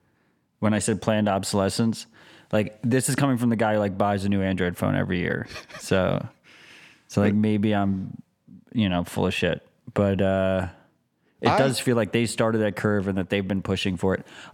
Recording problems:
none

